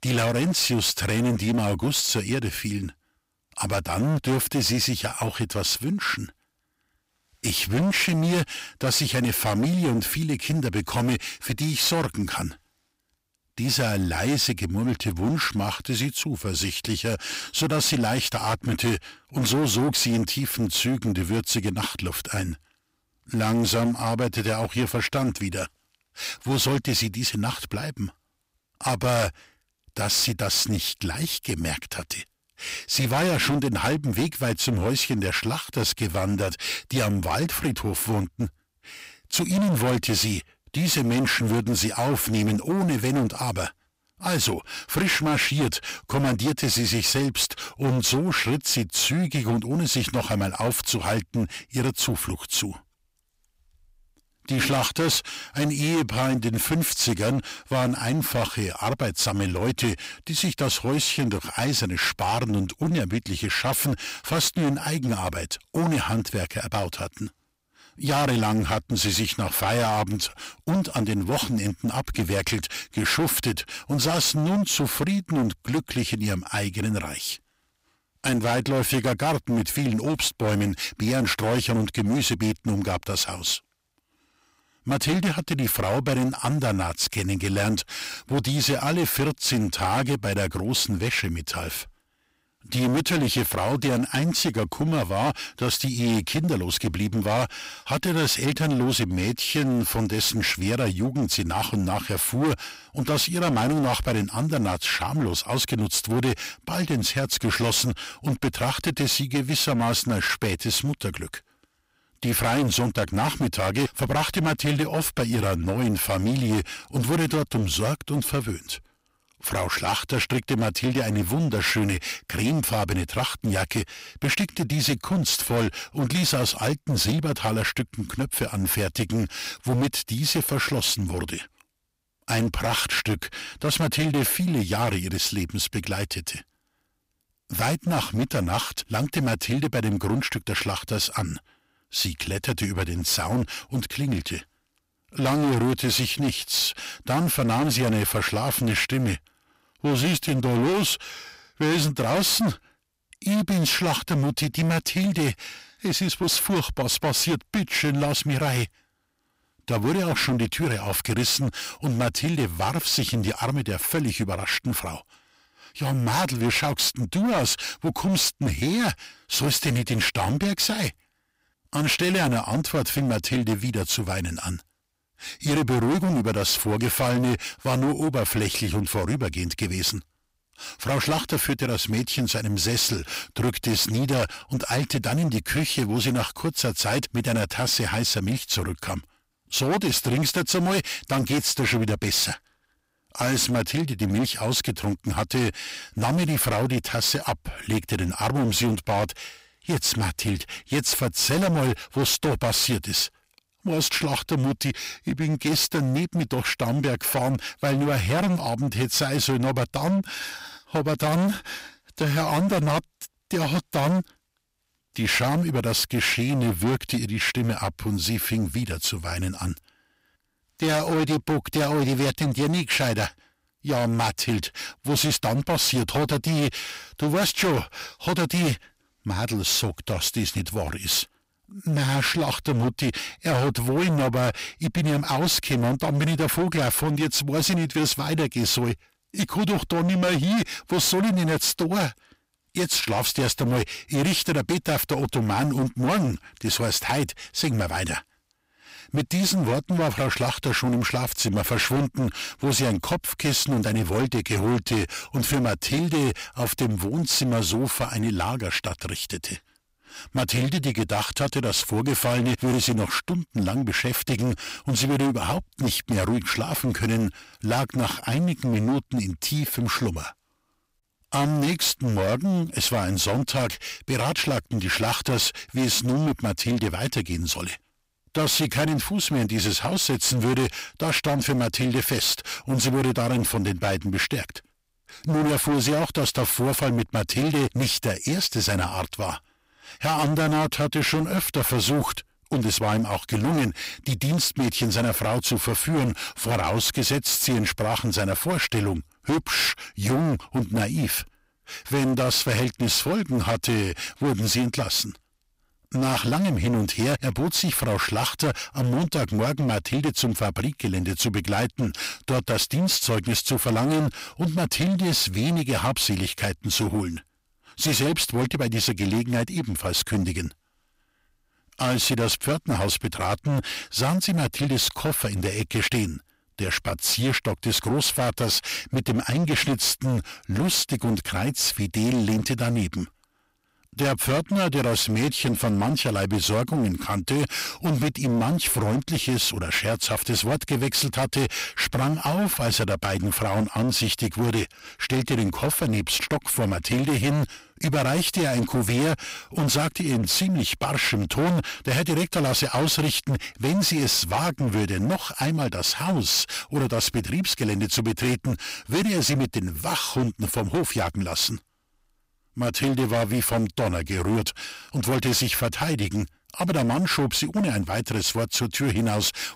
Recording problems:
distortion; heavy; 18% of the sound clipped

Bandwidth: 15.5 kHz